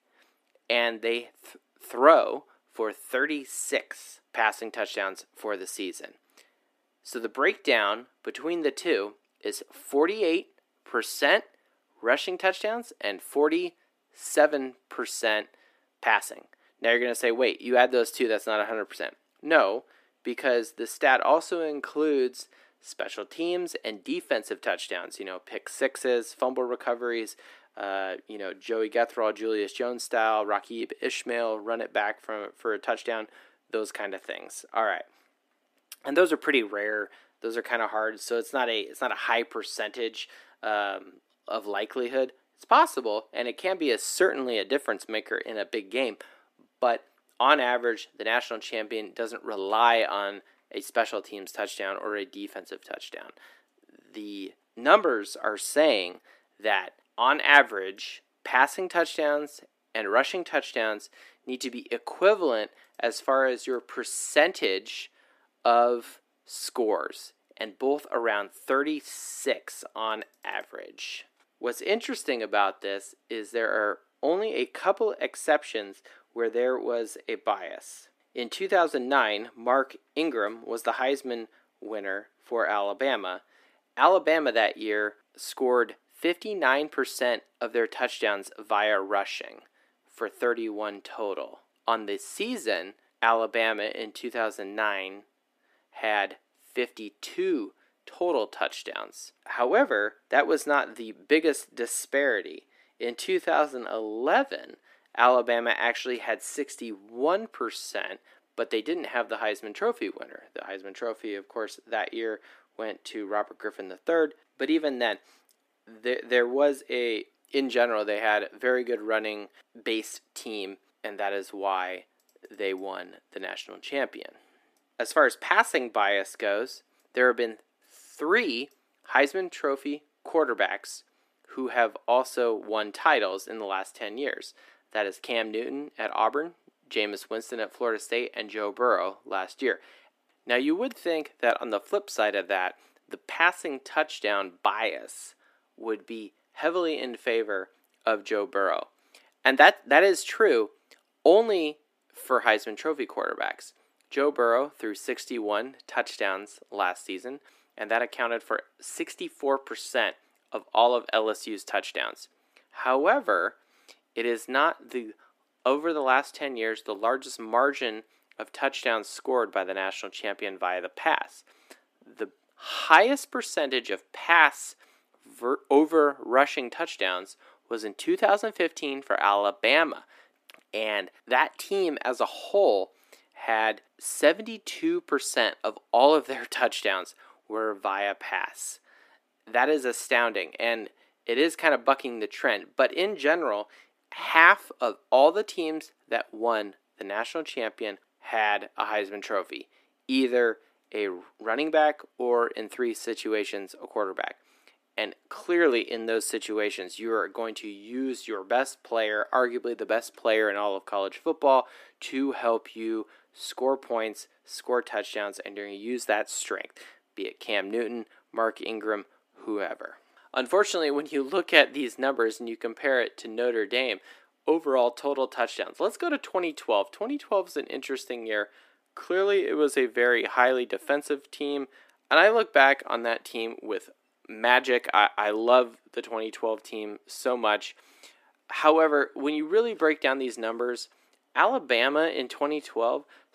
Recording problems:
thin; somewhat; fading below 300 Hz

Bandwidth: 14.5 kHz